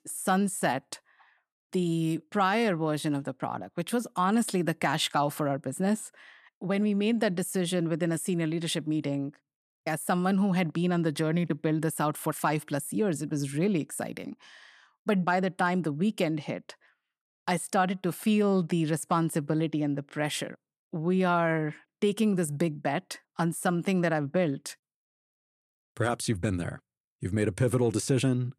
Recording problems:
none

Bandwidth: 13.5 kHz